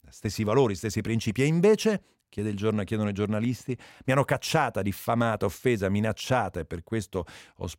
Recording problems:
none

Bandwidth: 16 kHz